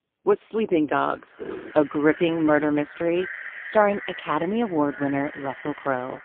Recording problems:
phone-call audio; poor line; nothing above 3 kHz
echo of what is said; noticeable; throughout; 350 ms later, 15 dB below the speech
footsteps; faint; at 1.5 s; peak 10 dB below the speech

